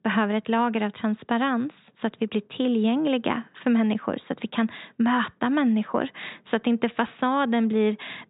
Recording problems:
high frequencies cut off; severe; nothing above 4 kHz

